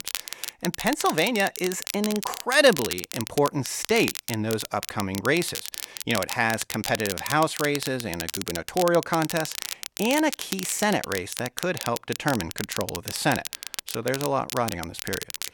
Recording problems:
crackle, like an old record; loud; 7 dB below the speech

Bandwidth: 17.5 kHz